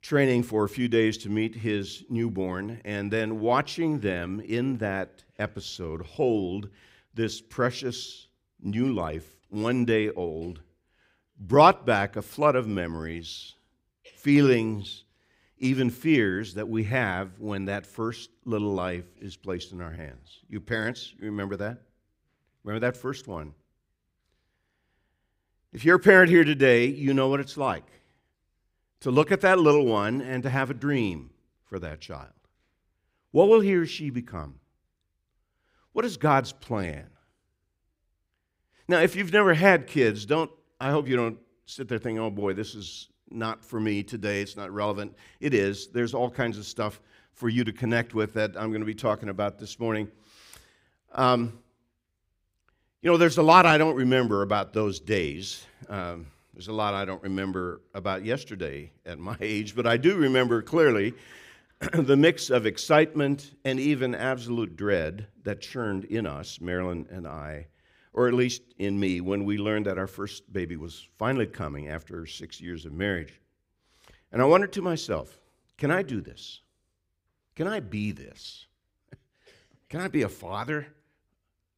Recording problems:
none

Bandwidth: 15.5 kHz